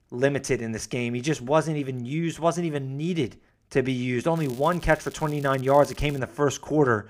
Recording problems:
crackling; faint; from 4.5 to 6 s; 25 dB below the speech

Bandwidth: 15.5 kHz